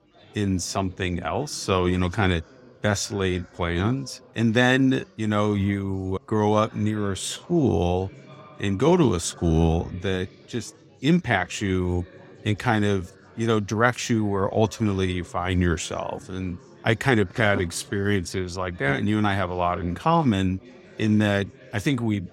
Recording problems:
chatter from many people; faint; throughout; 25 dB below the speech

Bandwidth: 16 kHz